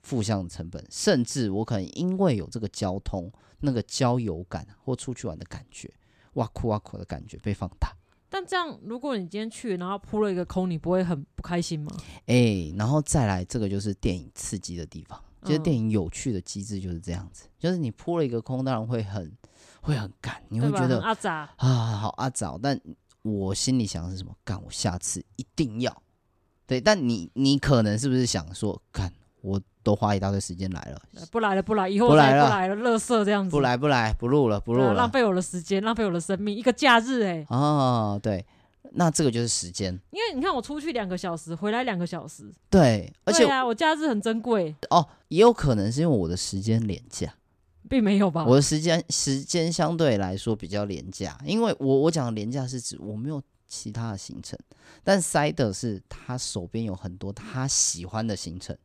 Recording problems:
none

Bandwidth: 14.5 kHz